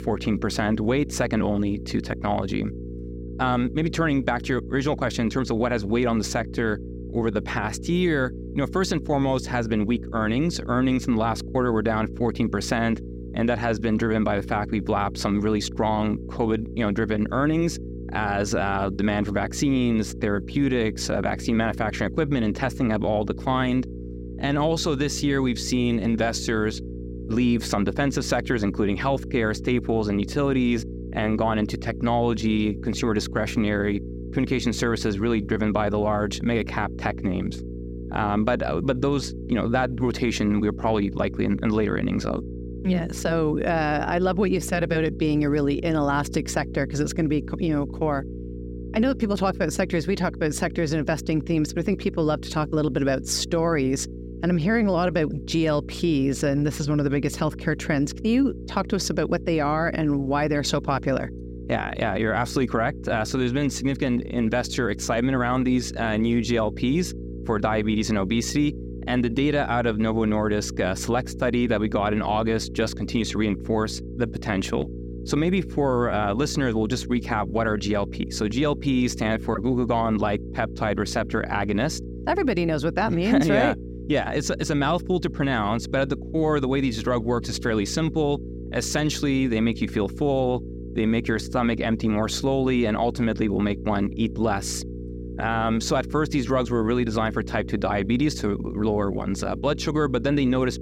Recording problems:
electrical hum; noticeable; throughout; 60 Hz, 15 dB below the speech

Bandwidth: 16 kHz